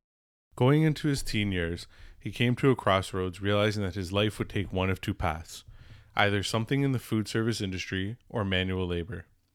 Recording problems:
none

